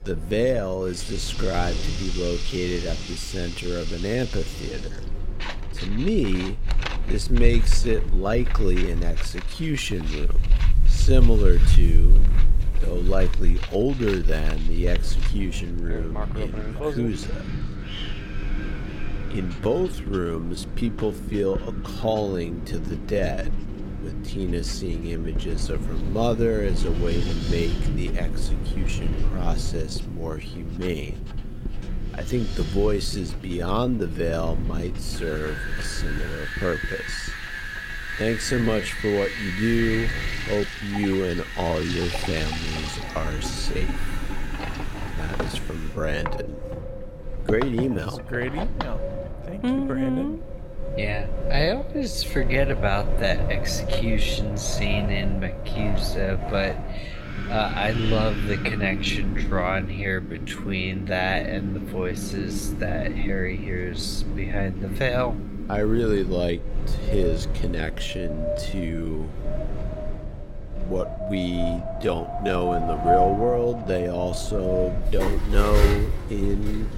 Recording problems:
wrong speed, natural pitch; too slow; 0.6 times normal speed
wind in the background; loud; throughout; 2 dB below the speech
household noises; noticeable; throughout; 10 dB below the speech

